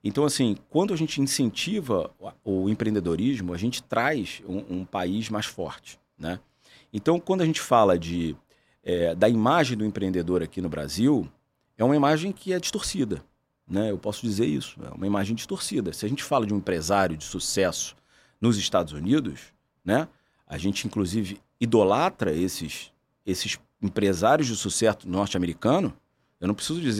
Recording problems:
abrupt cut into speech; at the end

